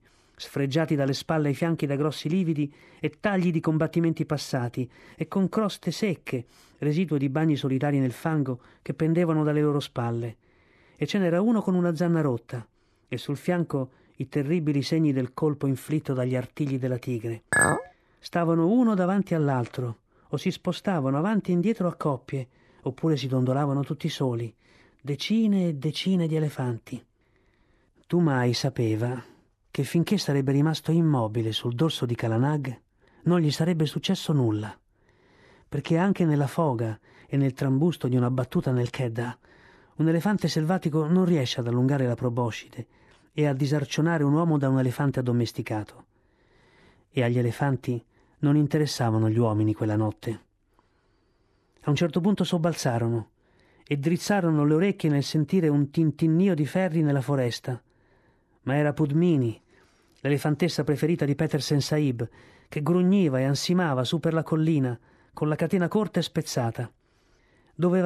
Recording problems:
clattering dishes; loud; at 18 s; peak 4 dB above the speech
abrupt cut into speech; at the end

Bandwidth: 13.5 kHz